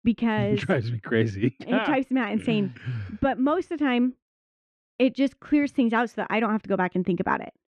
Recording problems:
muffled; very; fading above 2 kHz

